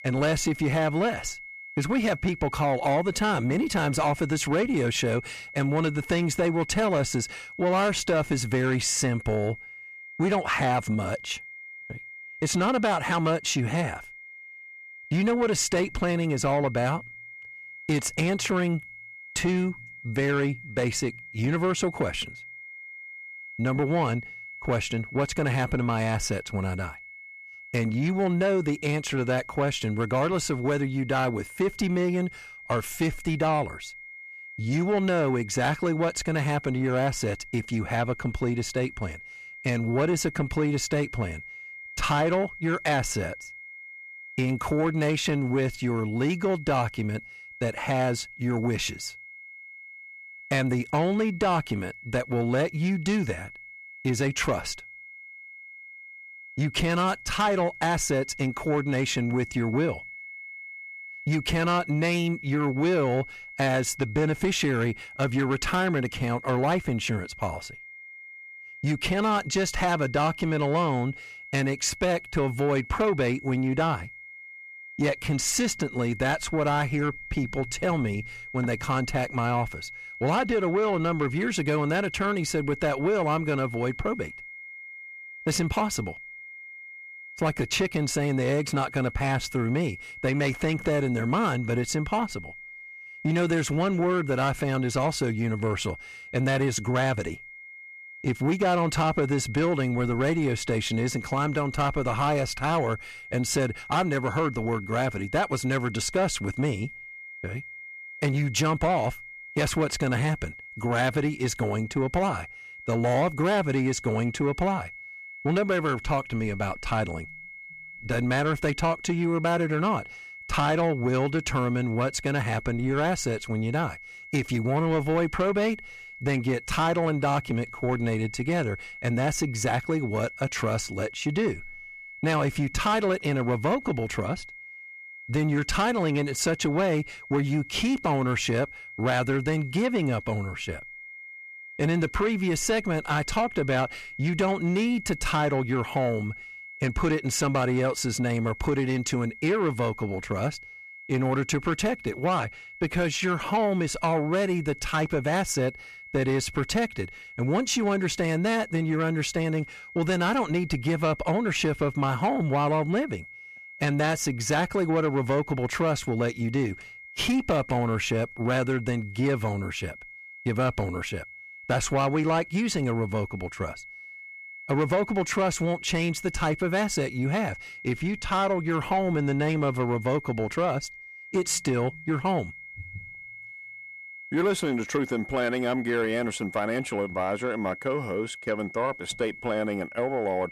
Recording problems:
distortion; slight; 10 dB below the speech
high-pitched whine; noticeable; throughout; 2 kHz, 15 dB below the speech

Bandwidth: 13.5 kHz